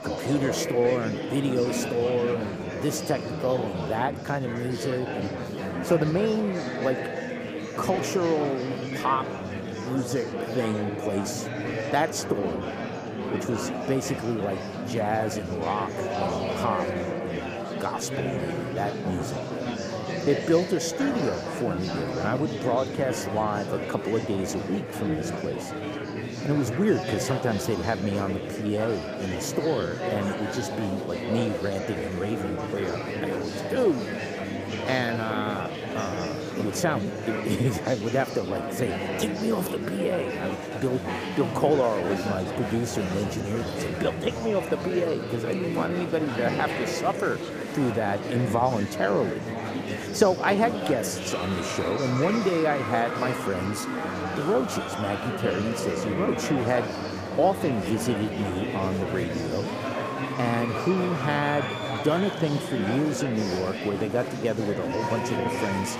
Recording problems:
murmuring crowd; loud; throughout; 3 dB below the speech

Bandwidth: 15 kHz